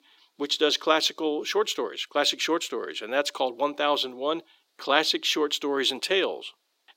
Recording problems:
thin; somewhat; fading below 350 Hz

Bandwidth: 16 kHz